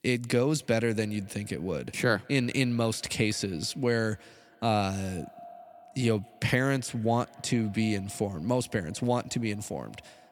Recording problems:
echo of what is said; faint; throughout; 190 ms later, 25 dB below the speech

